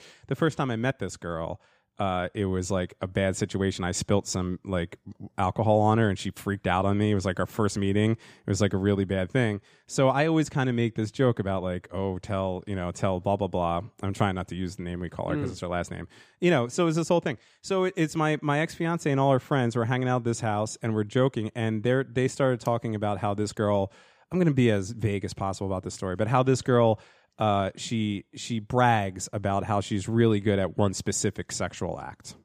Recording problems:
none

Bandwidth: 15 kHz